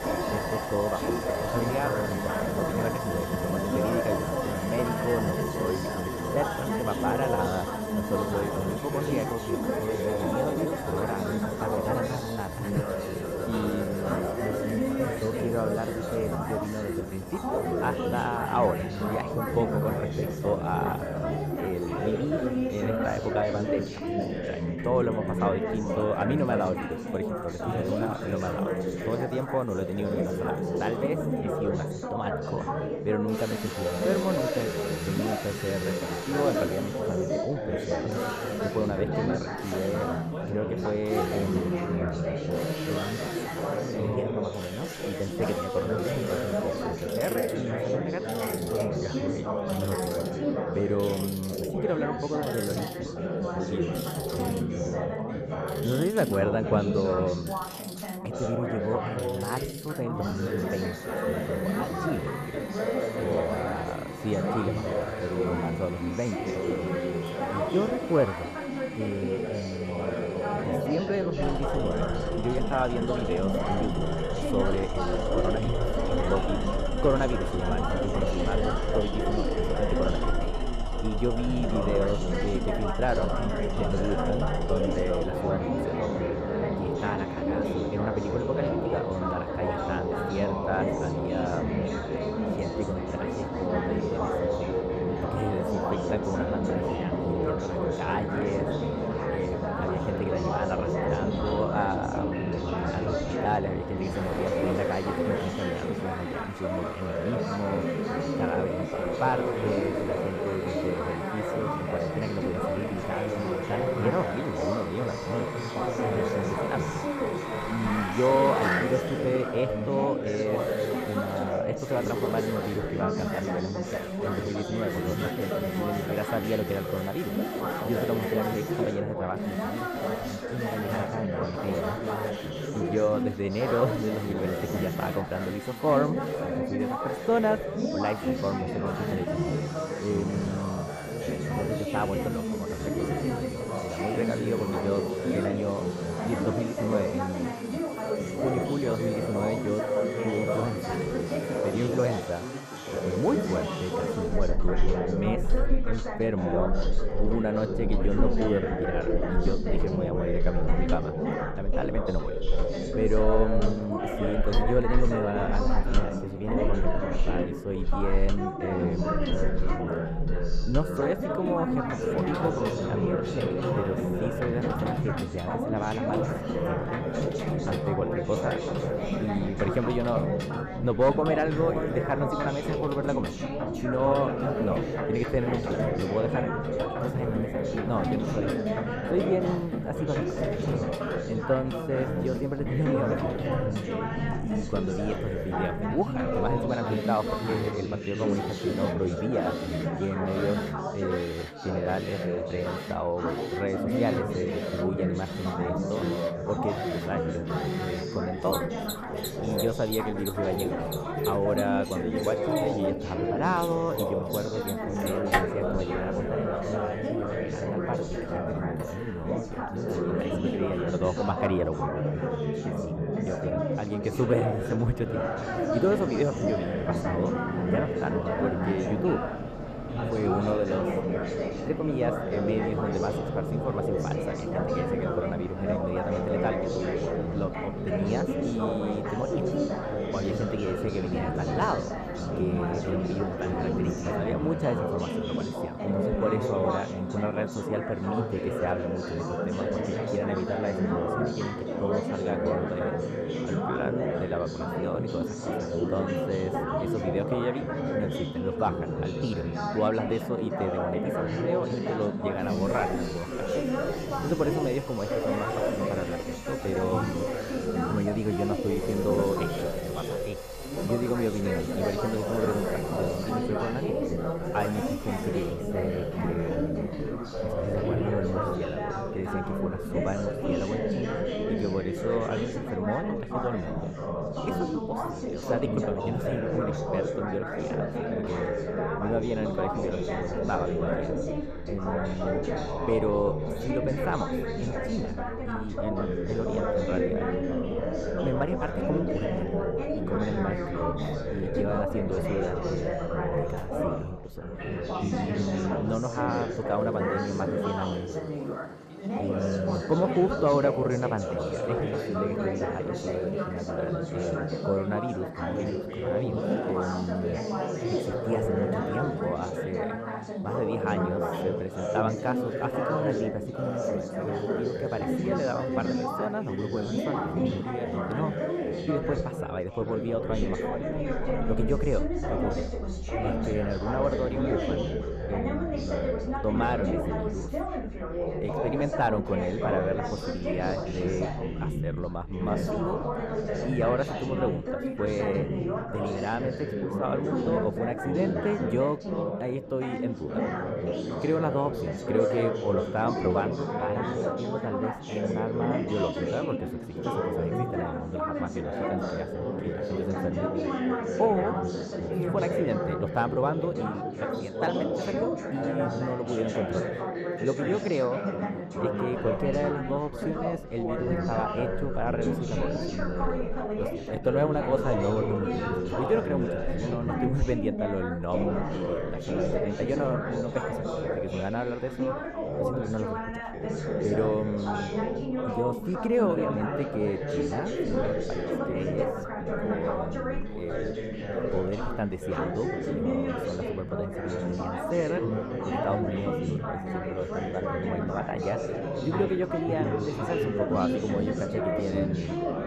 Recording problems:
muffled; slightly; fading above 2 kHz
chatter from many people; very loud; throughout; 1 dB above the speech
machinery noise; loud; throughout; 7 dB below the speech

